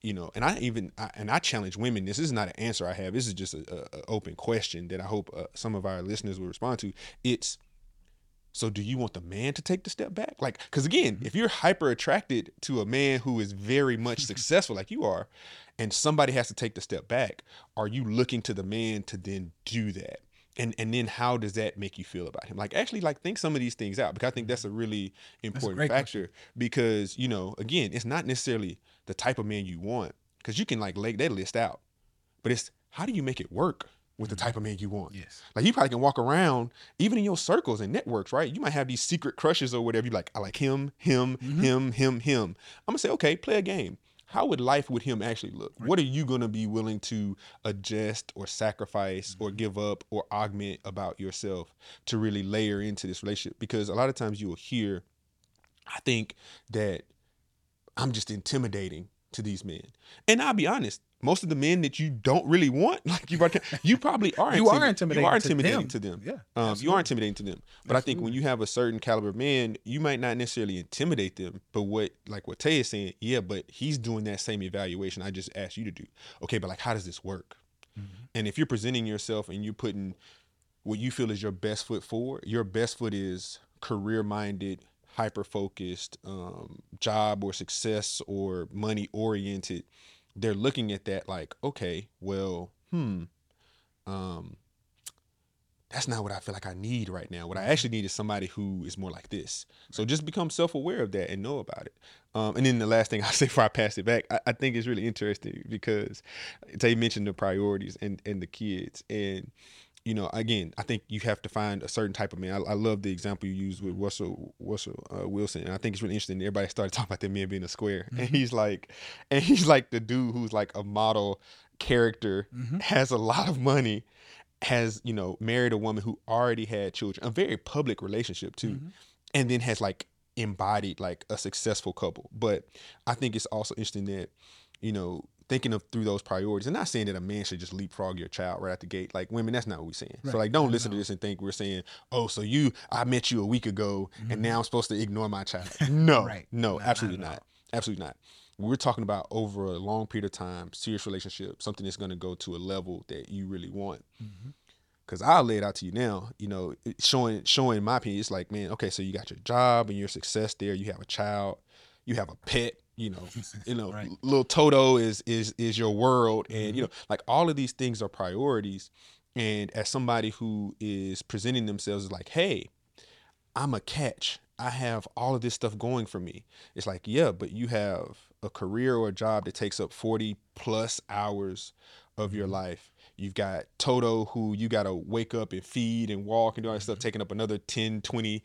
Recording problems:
none

